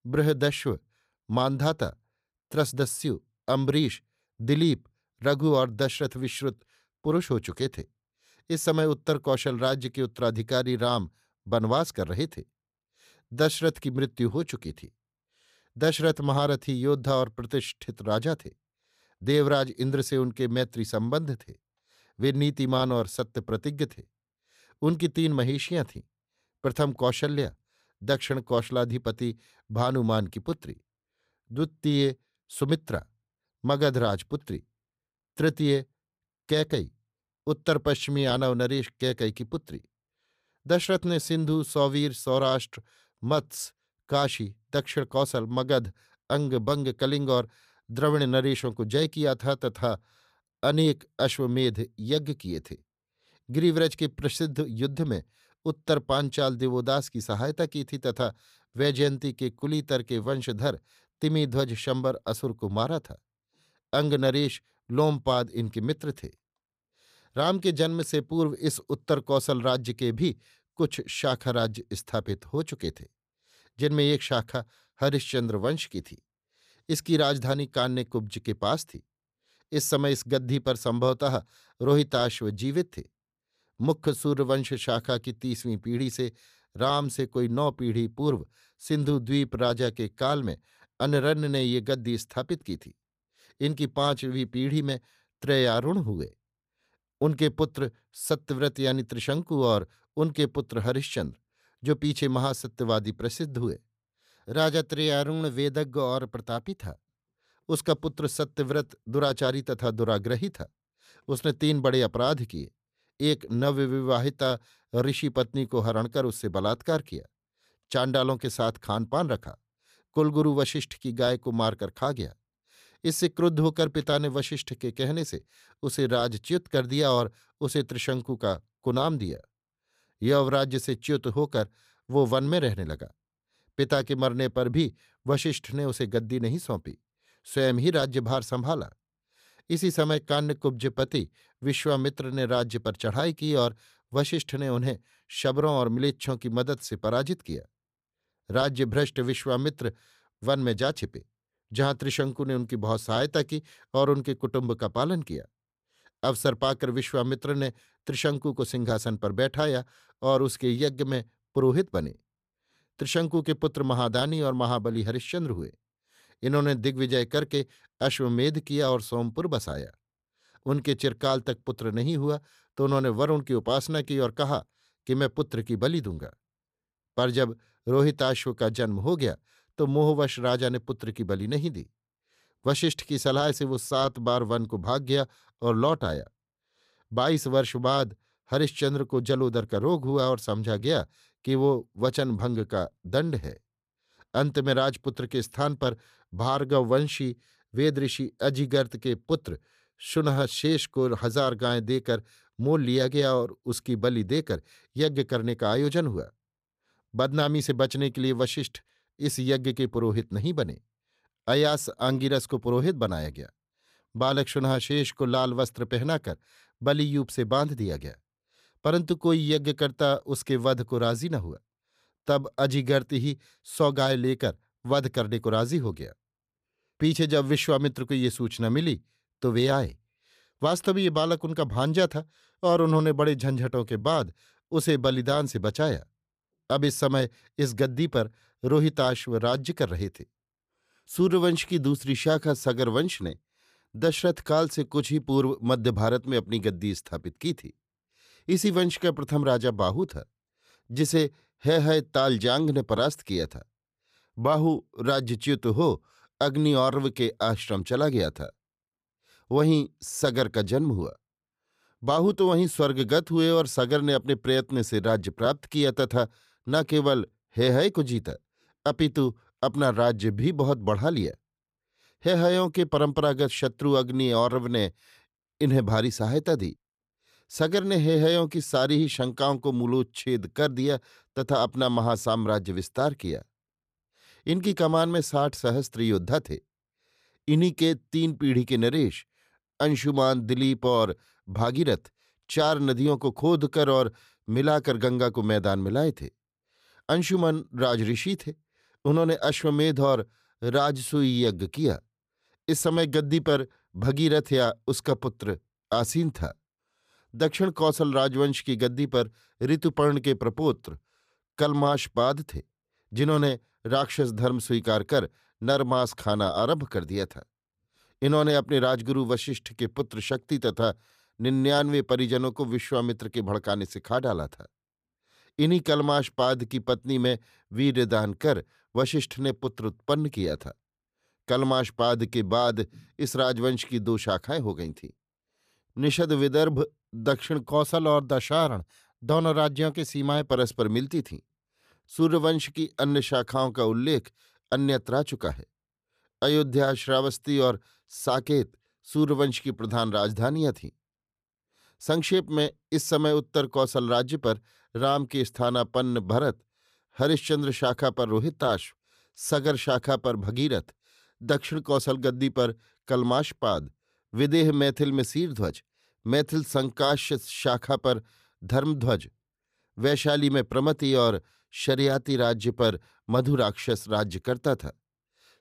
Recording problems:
none

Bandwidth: 14.5 kHz